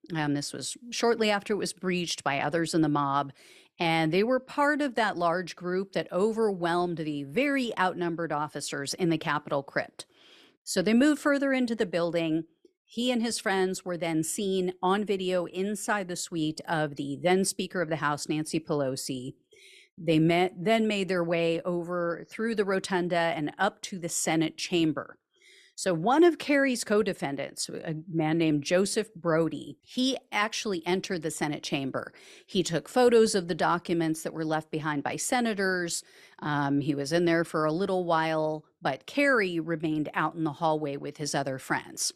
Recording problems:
none

